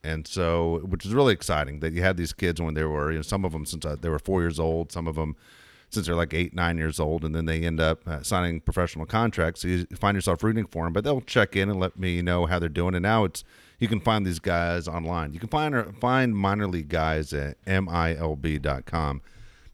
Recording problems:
none

